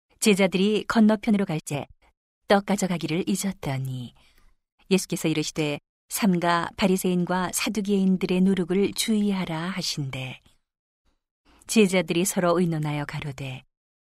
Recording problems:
uneven, jittery; strongly; from 1 to 12 s

